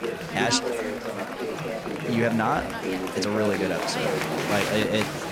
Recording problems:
murmuring crowd; loud; throughout; 2 dB below the speech

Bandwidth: 16.5 kHz